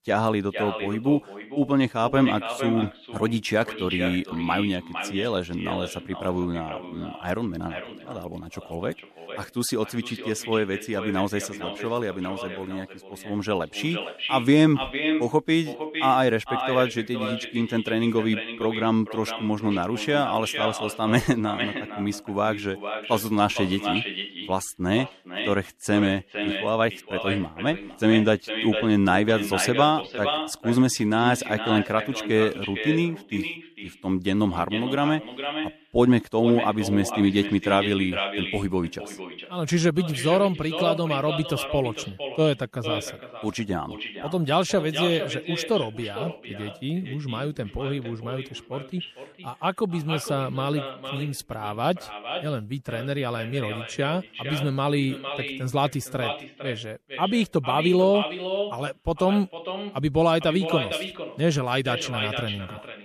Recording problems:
echo of what is said; strong; throughout; 460 ms later, 7 dB below the speech

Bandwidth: 14 kHz